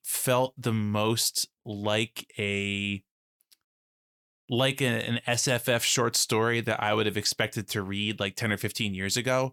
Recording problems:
none

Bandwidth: 19 kHz